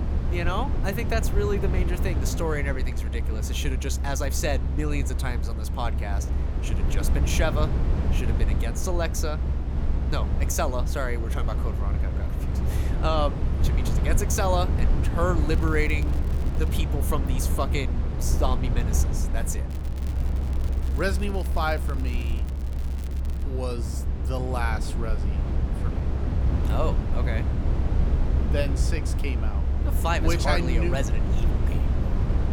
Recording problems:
low rumble; loud; throughout; 8 dB below the speech
crackling; noticeable; from 15 to 17 s and from 20 to 23 s; 20 dB below the speech

